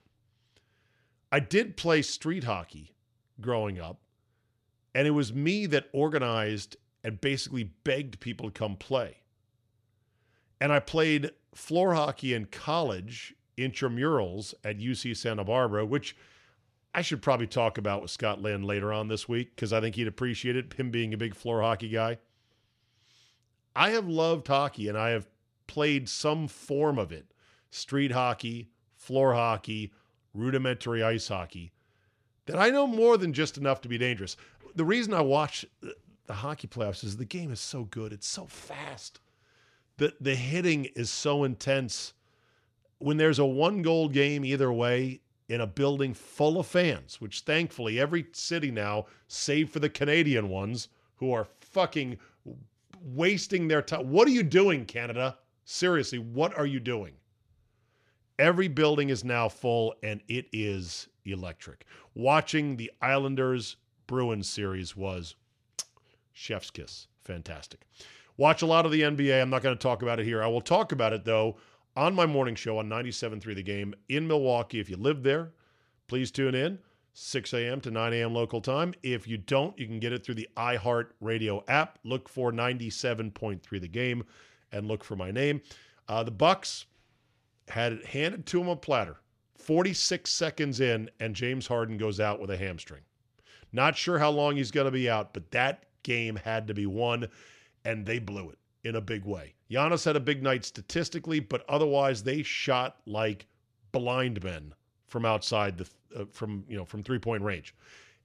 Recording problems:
none

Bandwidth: 13.5 kHz